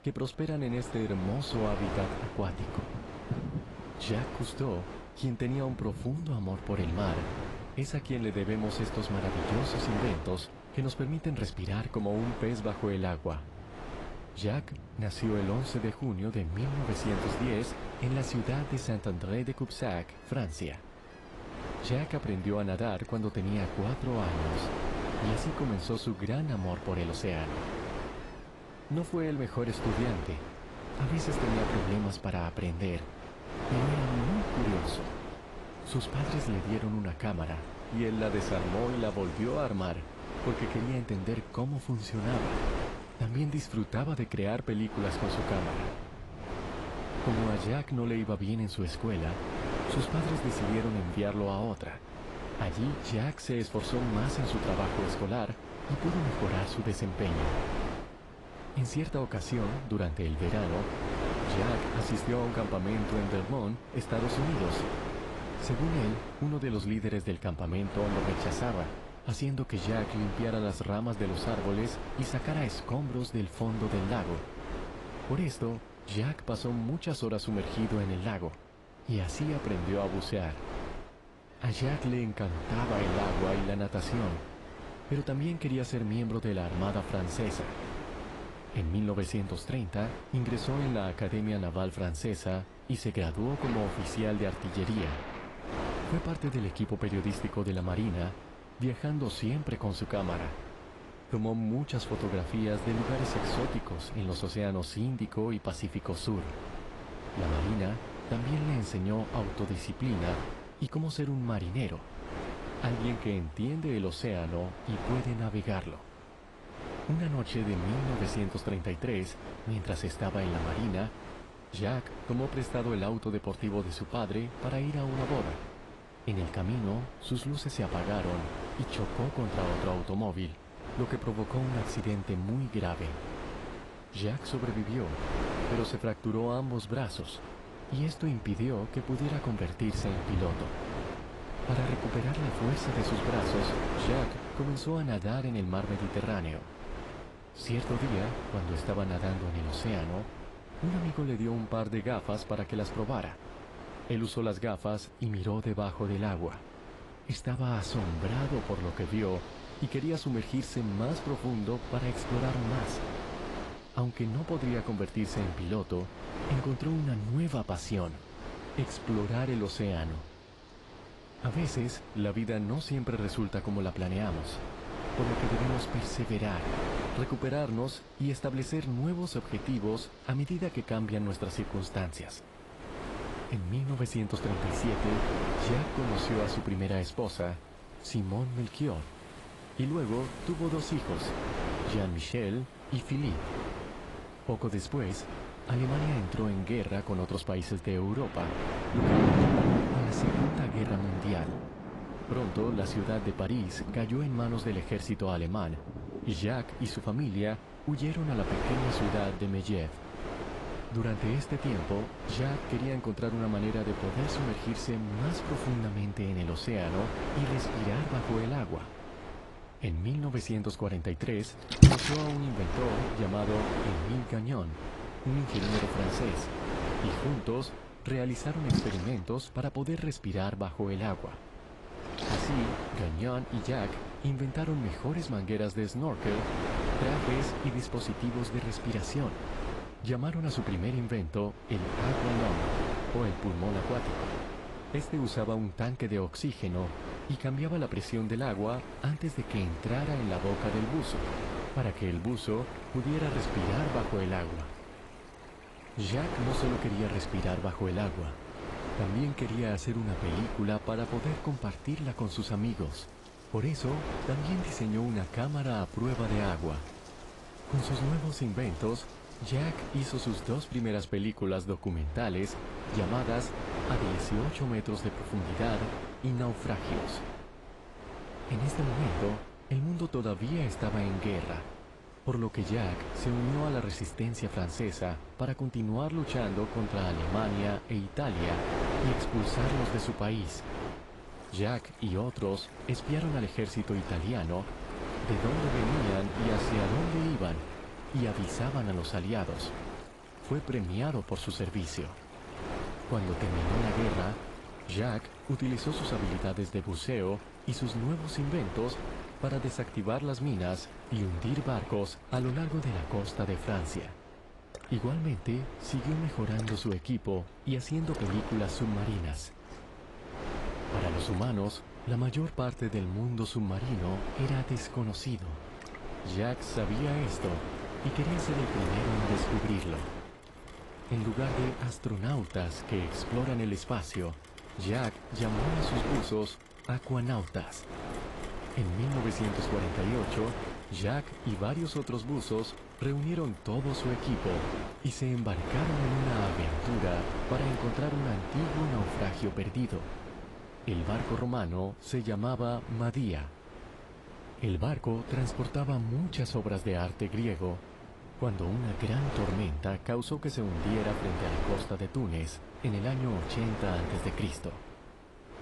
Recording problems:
garbled, watery; slightly; nothing above 11 kHz
wind noise on the microphone; heavy; 2 dB below the speech
rain or running water; loud; throughout; 8 dB below the speech

